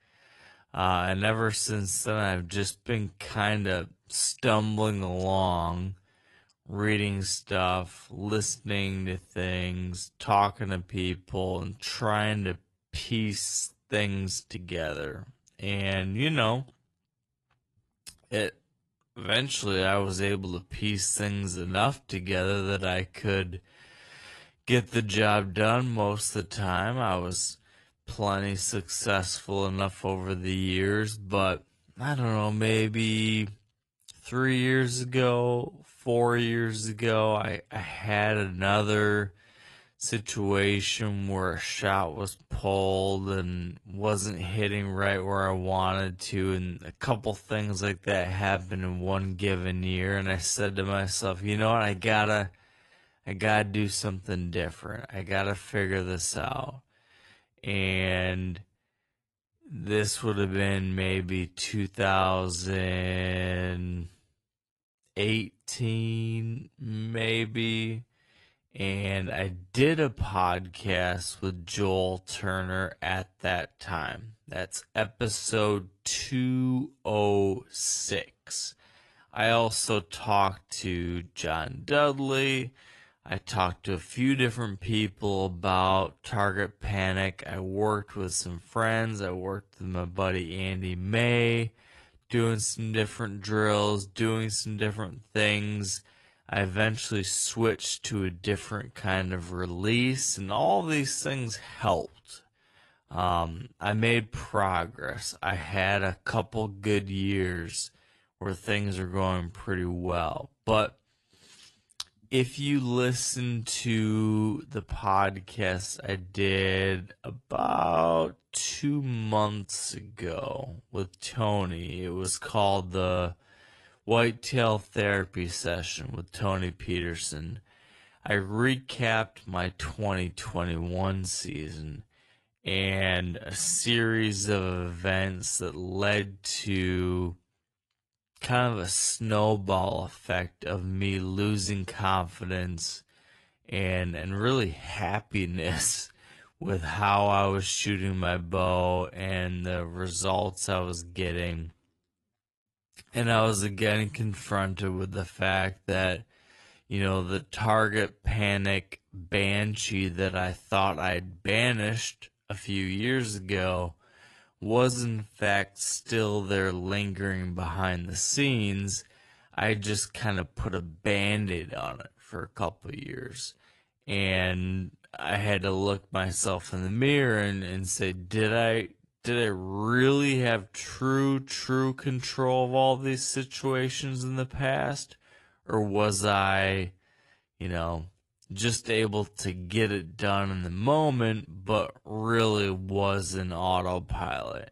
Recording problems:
wrong speed, natural pitch; too slow; 0.6 times normal speed
garbled, watery; slightly; nothing above 11 kHz

